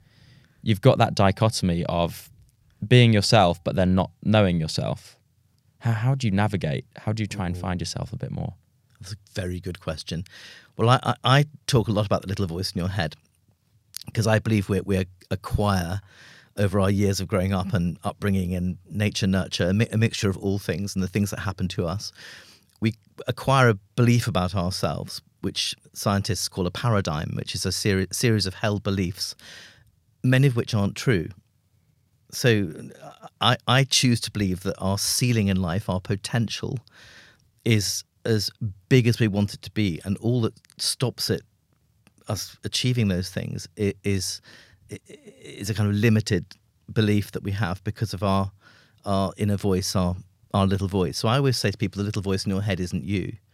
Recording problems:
none

